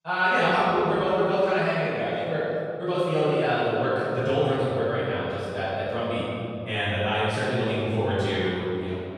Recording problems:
room echo; strong; dies away in 2.4 s
off-mic speech; far
wrong speed, natural pitch; too fast; 1.6 times normal speed

